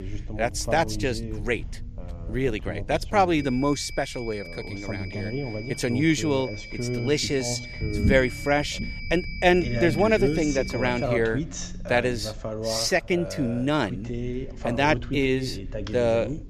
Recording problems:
voice in the background; loud; throughout; 8 dB below the speech
high-pitched whine; noticeable; from 3.5 to 11 s; 2.5 kHz, 15 dB below the speech
low rumble; faint; throughout; 20 dB below the speech

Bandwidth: 14 kHz